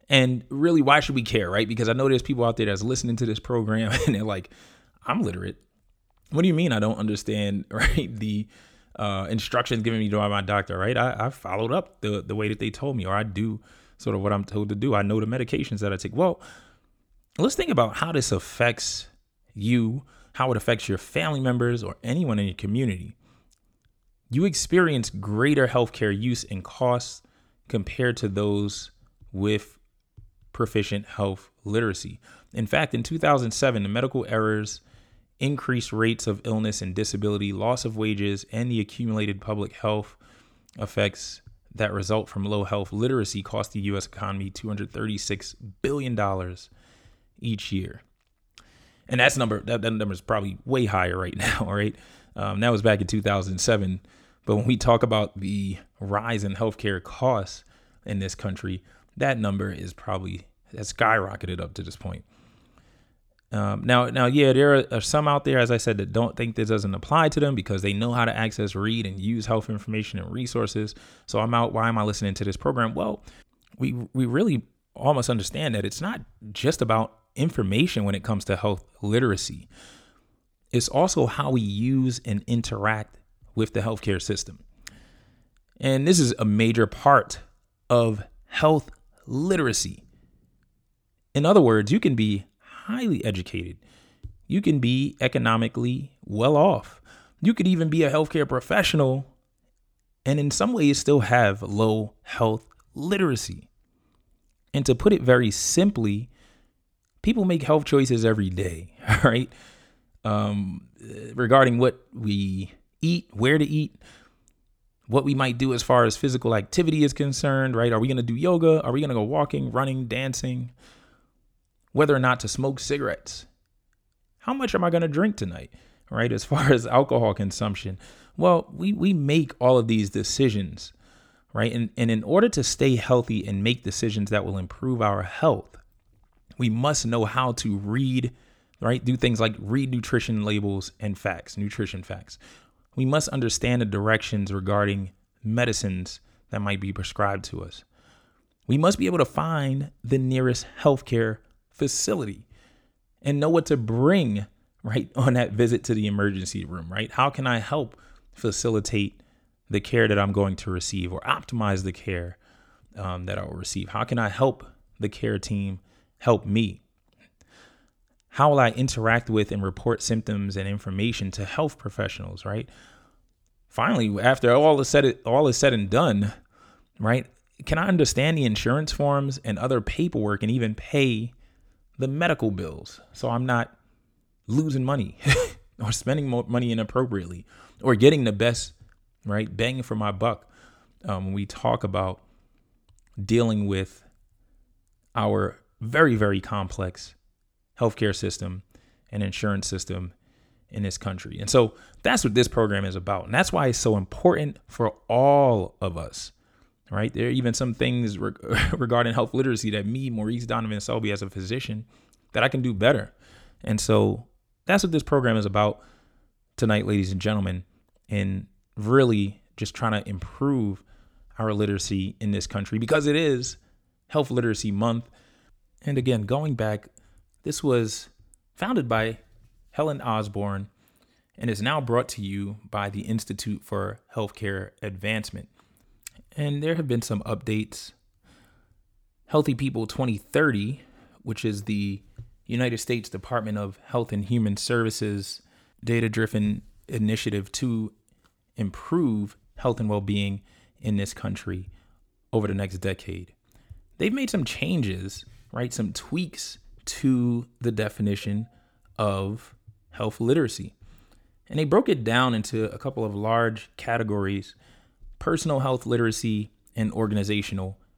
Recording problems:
none

